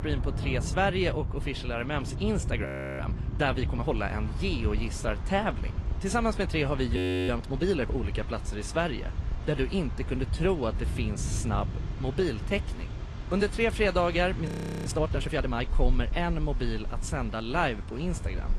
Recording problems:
garbled, watery; slightly
rain or running water; loud; throughout; 7 dB below the speech
wind noise on the microphone; occasional gusts; 20 dB below the speech
audio freezing; at 2.5 s, at 7 s and at 14 s

